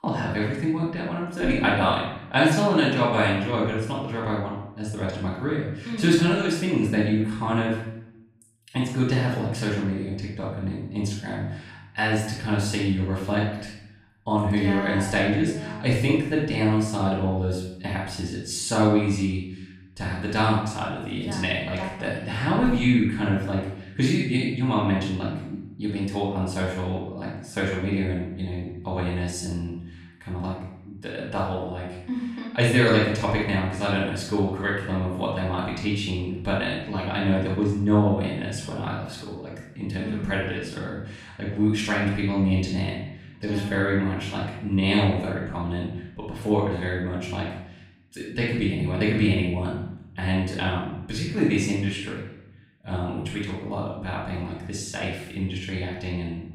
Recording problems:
off-mic speech; far
room echo; noticeable; dies away in 0.7 s

